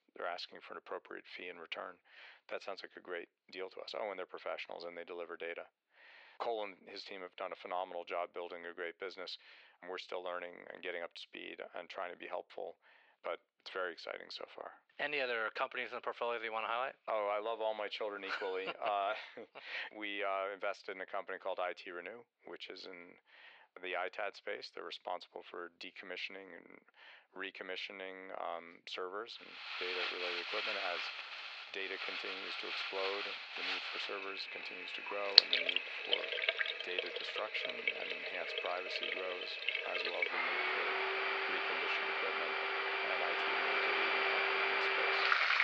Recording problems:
thin; very; fading below 500 Hz
muffled; very slightly; fading above 4 kHz
household noises; very loud; from 30 s on; 8 dB above the speech

